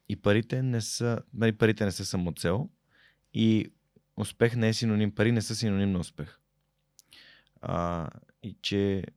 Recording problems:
none

